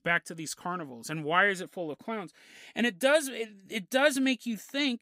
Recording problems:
none

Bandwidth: 15.5 kHz